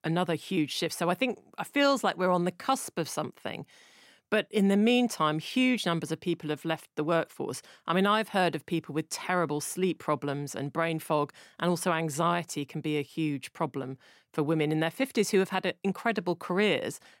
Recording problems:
none

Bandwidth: 16 kHz